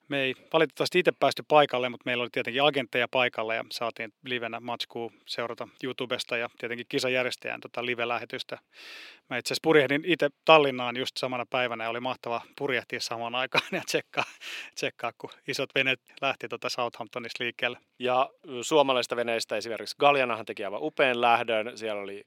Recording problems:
thin; somewhat; fading below 400 Hz

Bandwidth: 16.5 kHz